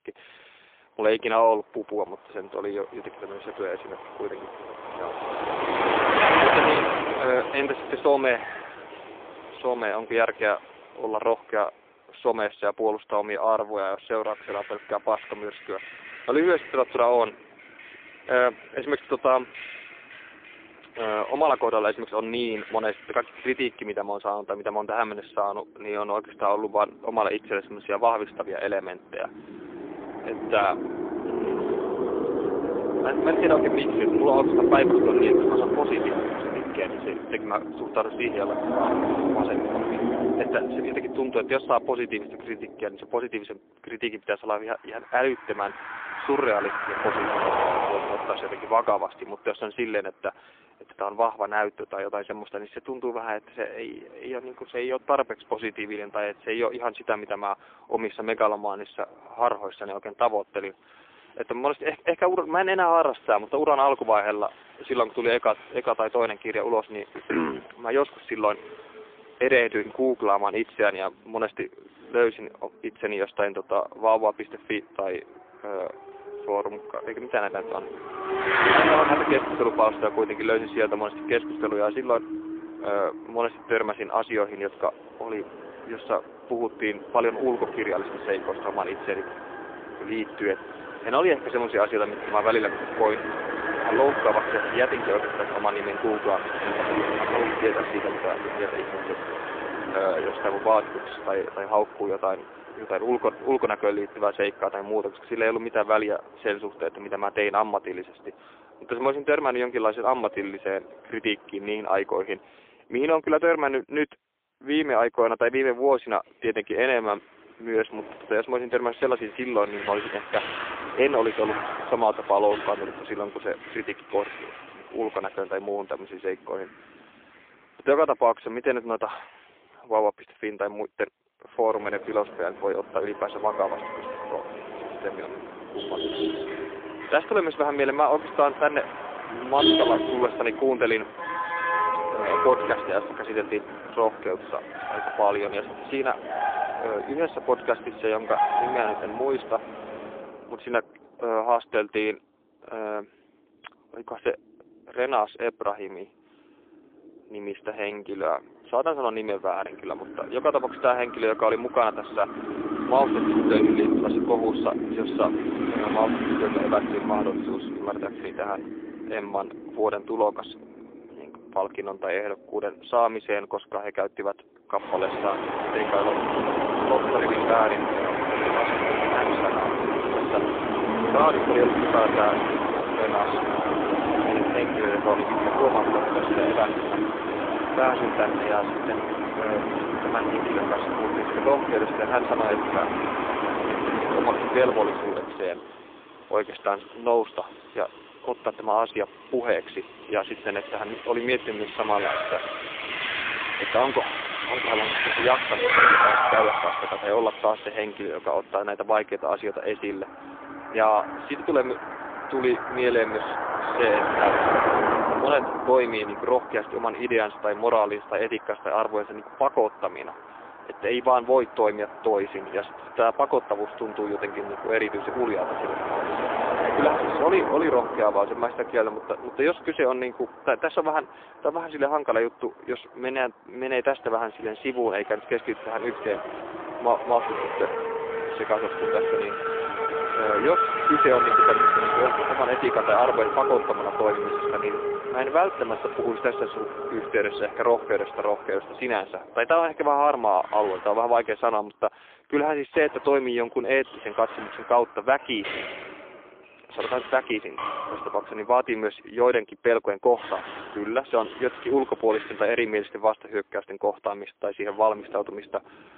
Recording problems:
phone-call audio; poor line
traffic noise; loud; throughout; 1 dB below the speech

